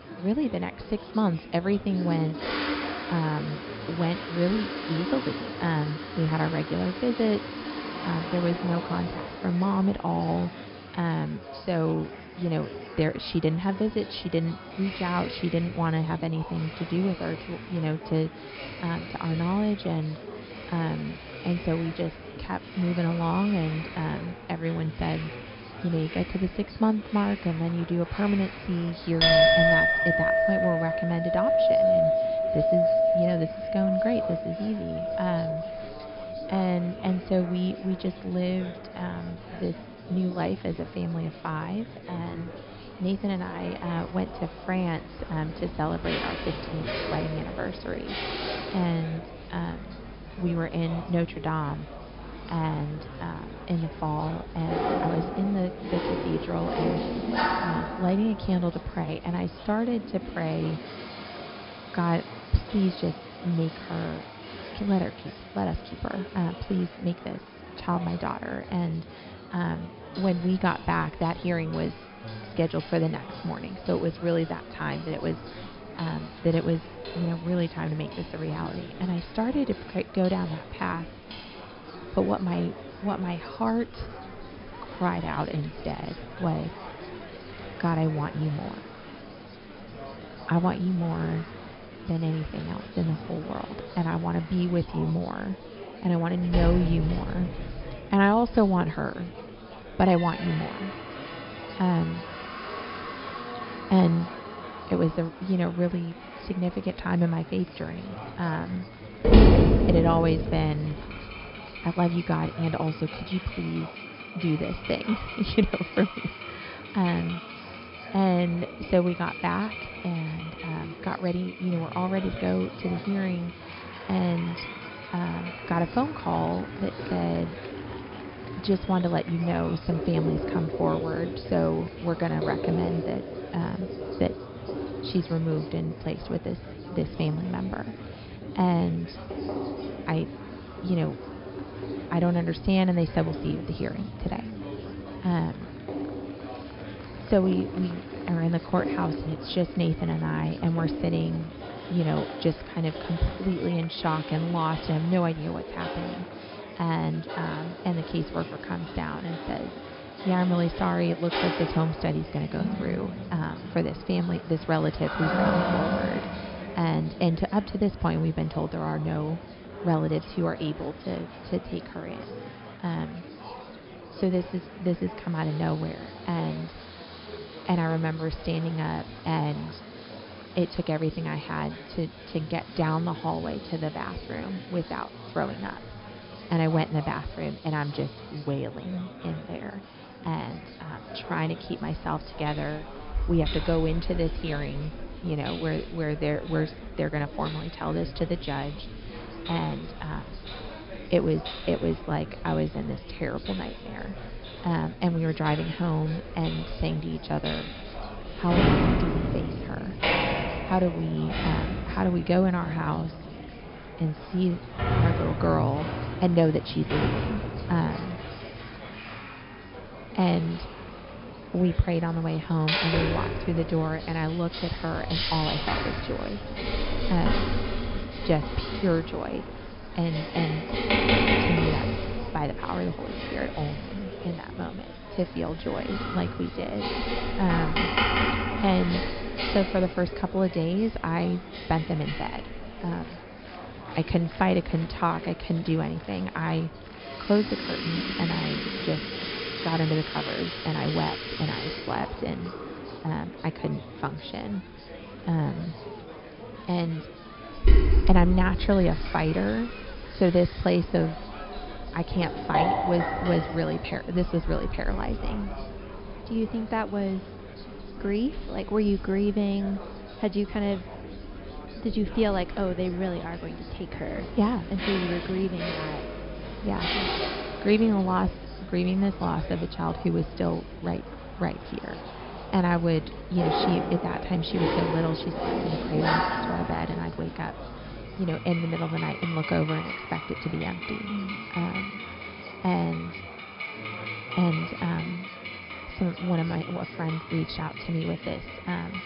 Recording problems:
high frequencies cut off; noticeable; nothing above 5.5 kHz
household noises; loud; throughout; 3 dB below the speech
murmuring crowd; noticeable; throughout; 15 dB below the speech

